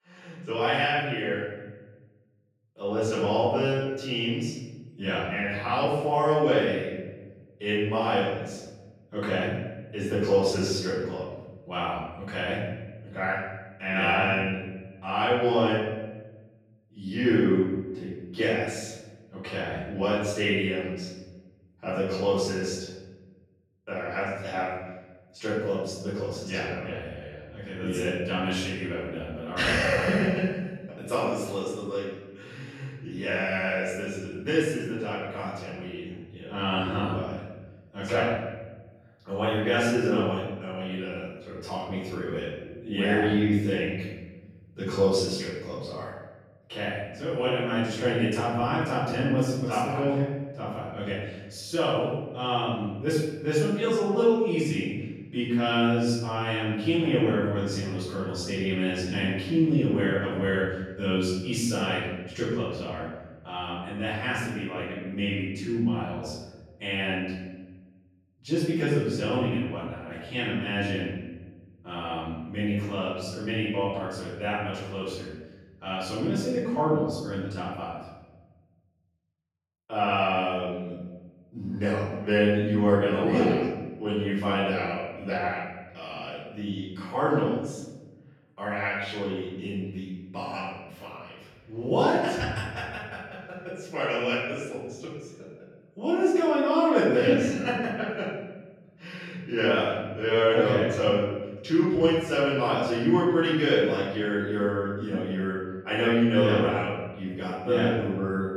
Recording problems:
off-mic speech; far
room echo; noticeable; dies away in 1.1 s

